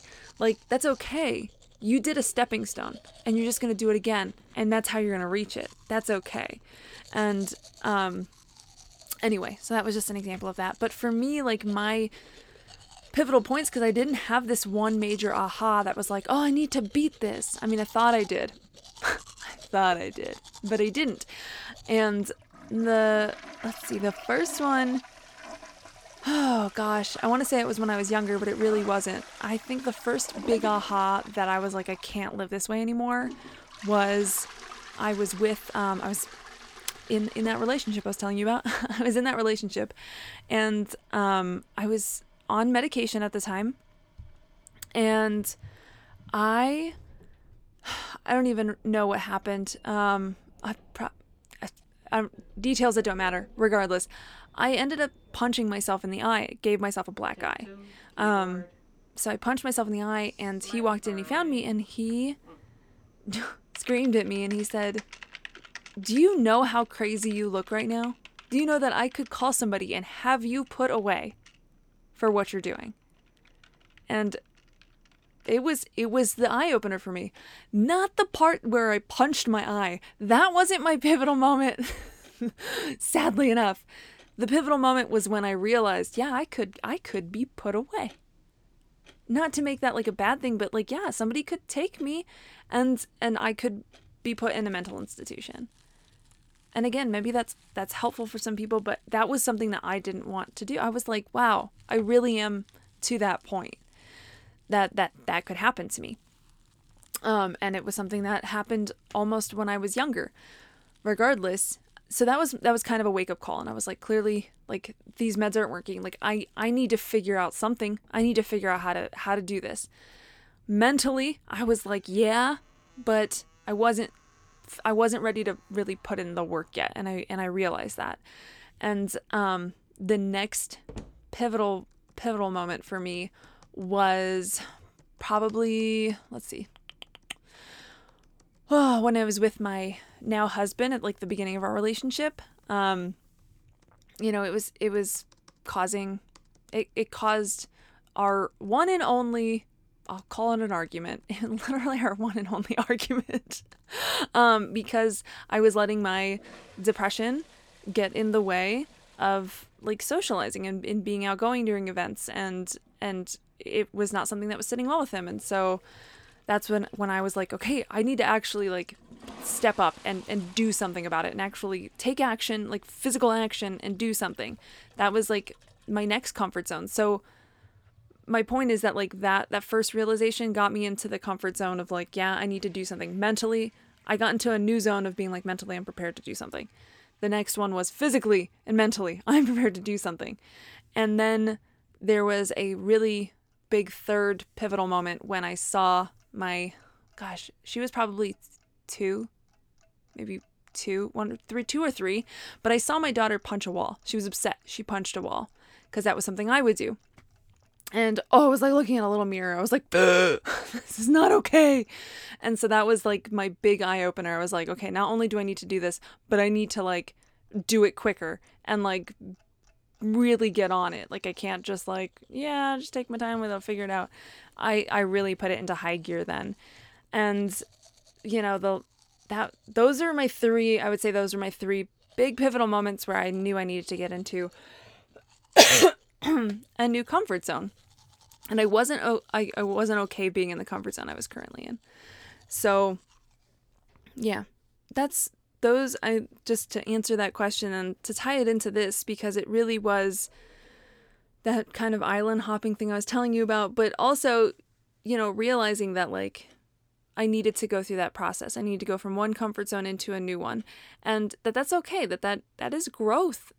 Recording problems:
household noises; faint; throughout; 25 dB below the speech

